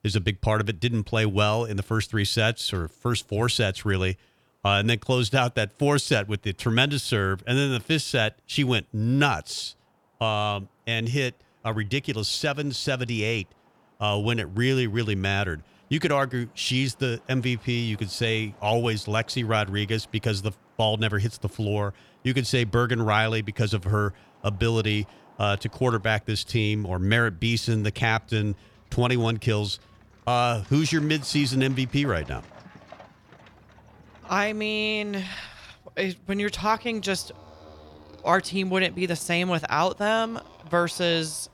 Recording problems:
traffic noise; faint; throughout; 25 dB below the speech

